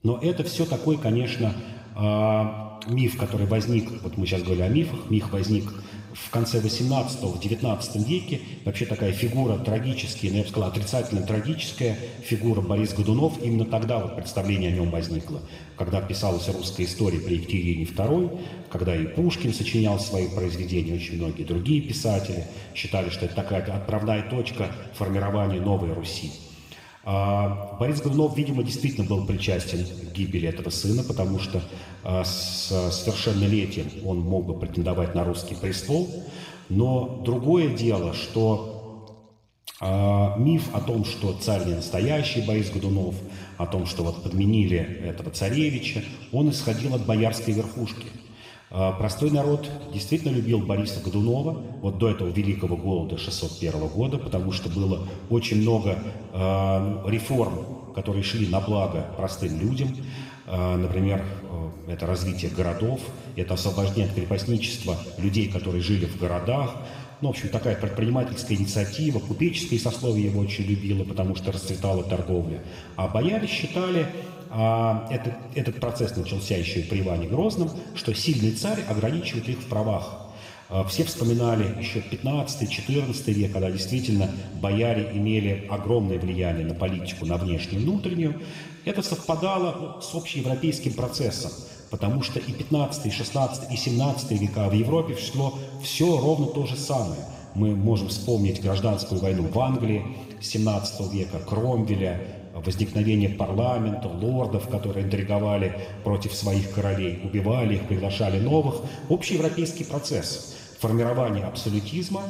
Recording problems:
room echo; noticeable; dies away in 1.6 s
off-mic speech; somewhat distant

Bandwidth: 15.5 kHz